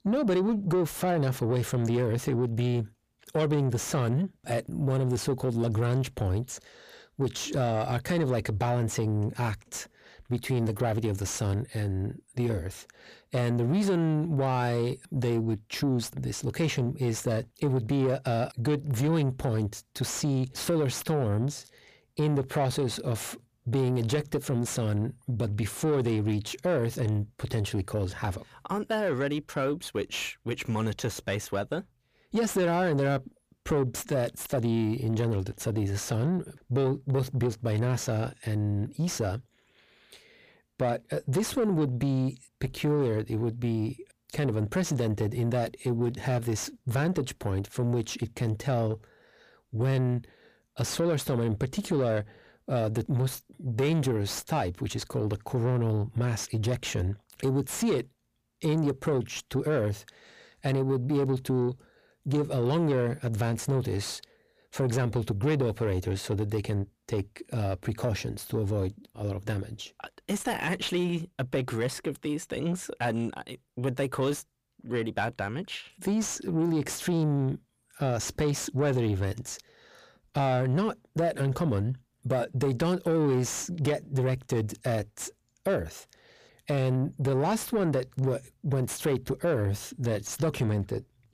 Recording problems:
distortion; slight; 10 dB below the speech

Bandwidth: 15 kHz